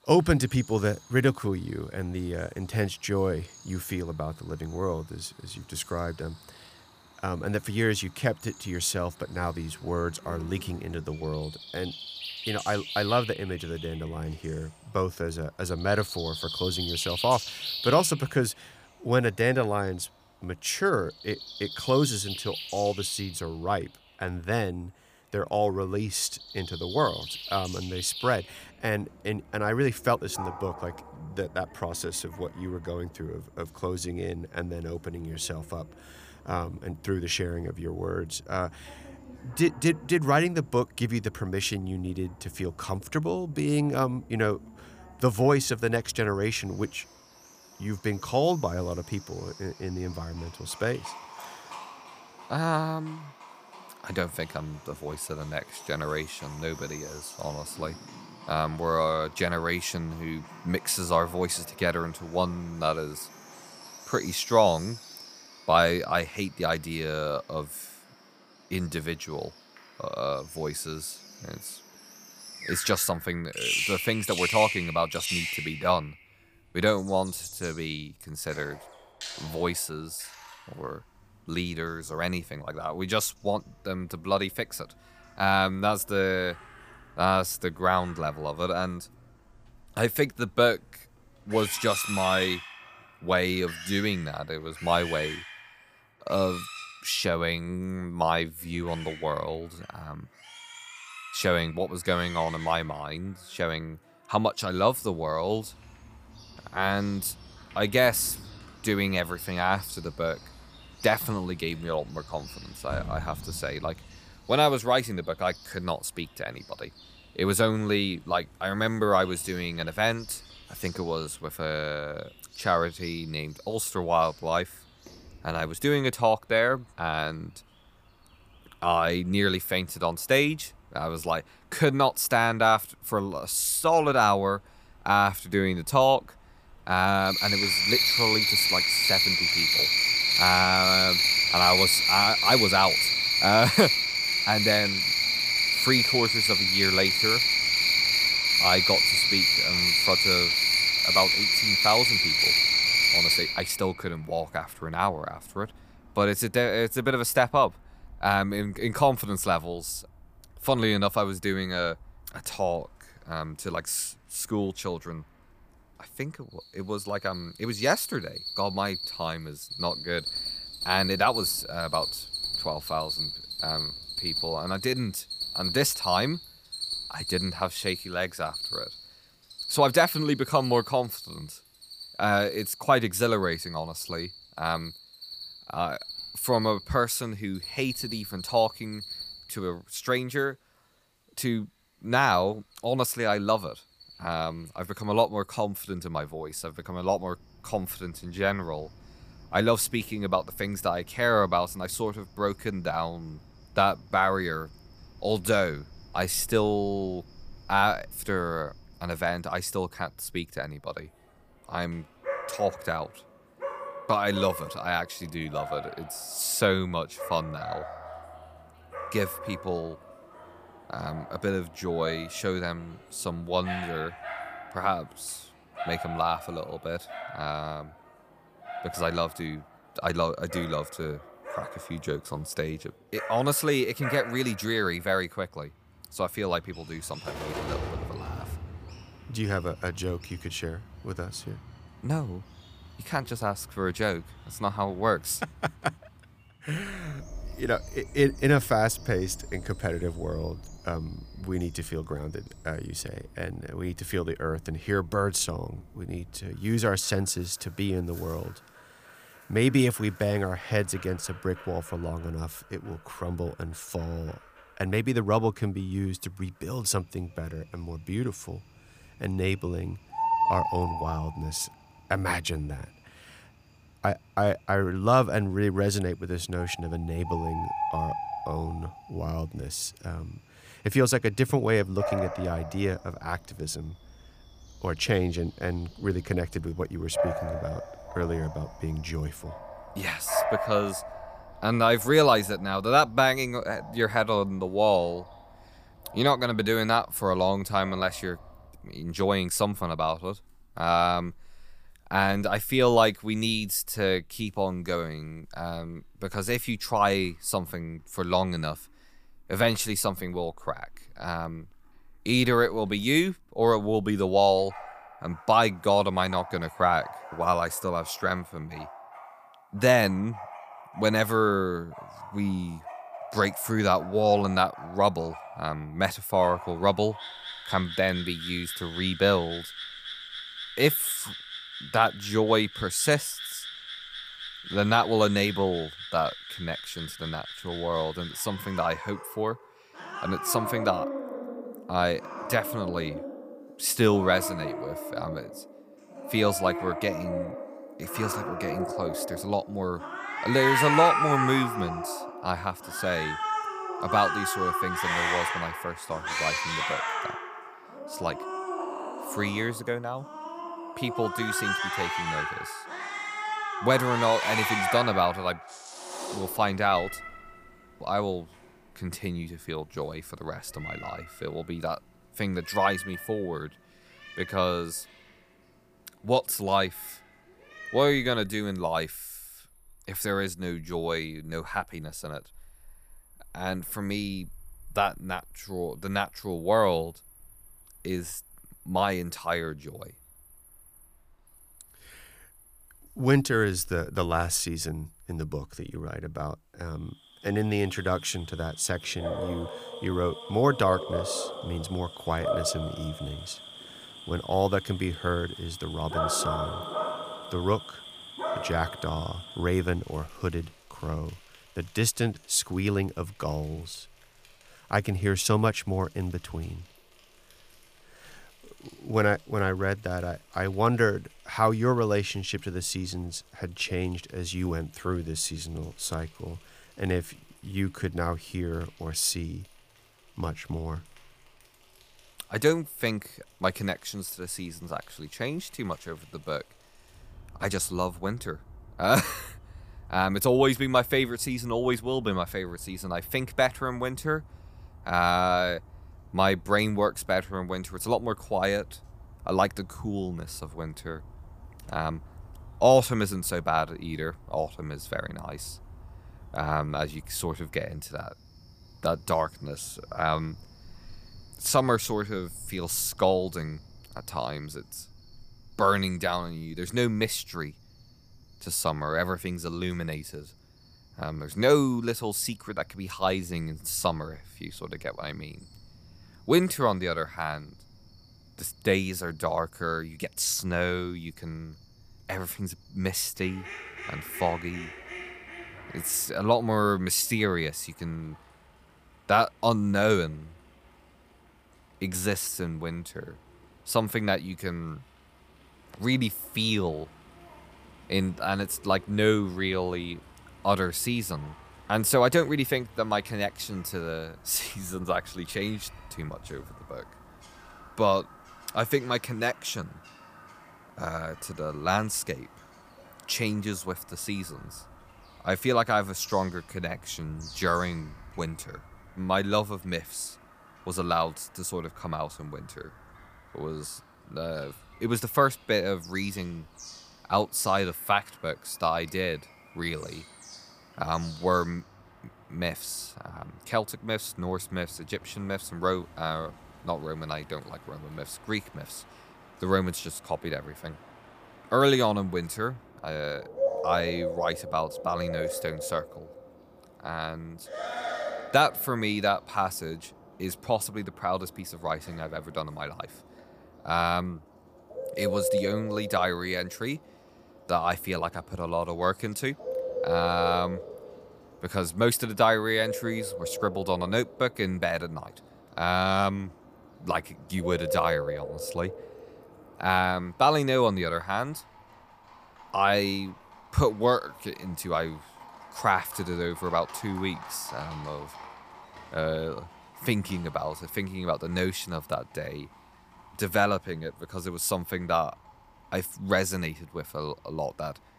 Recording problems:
animal sounds; loud; throughout; 1 dB below the speech

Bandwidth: 15 kHz